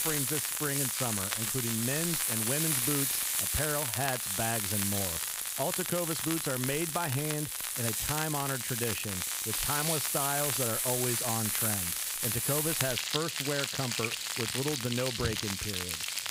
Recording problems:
household noises; very loud; throughout; 4 dB above the speech
crackle, like an old record; loud; 5 dB below the speech

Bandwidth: 15.5 kHz